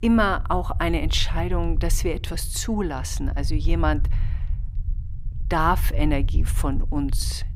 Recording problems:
low rumble; faint; throughout; 20 dB below the speech

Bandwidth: 15.5 kHz